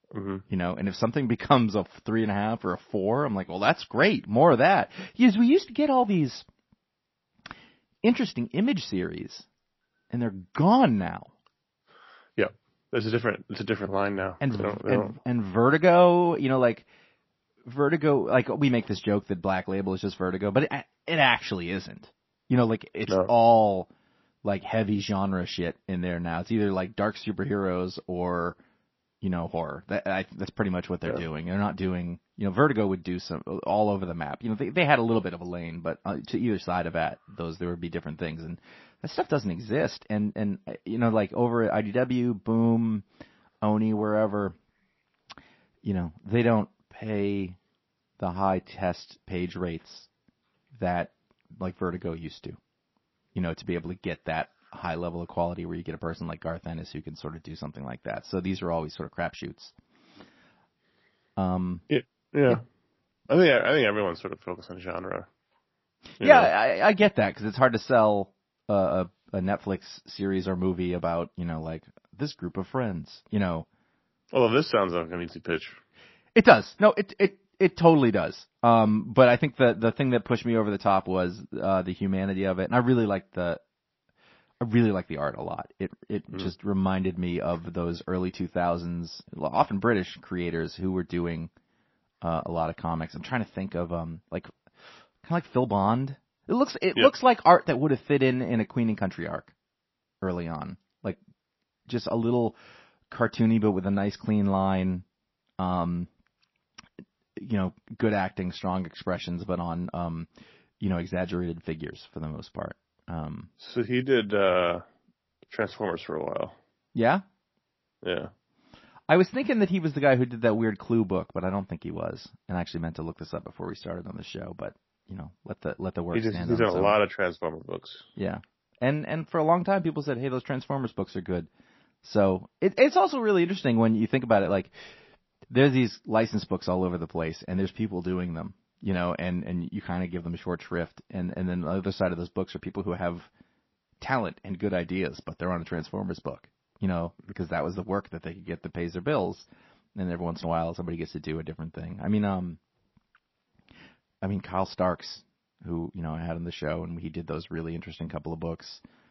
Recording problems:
garbled, watery; slightly; nothing above 5.5 kHz

